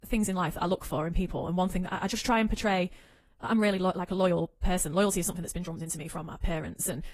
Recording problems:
wrong speed, natural pitch; too fast; 1.5 times normal speed
garbled, watery; slightly

